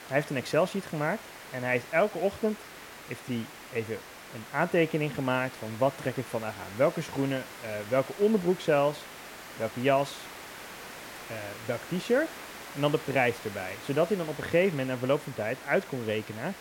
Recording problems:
hiss; noticeable; throughout; 15 dB below the speech

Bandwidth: 16.5 kHz